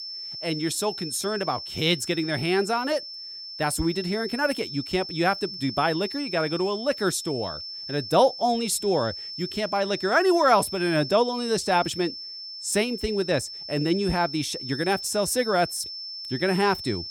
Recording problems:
high-pitched whine; loud; throughout; 5.5 kHz, 9 dB below the speech

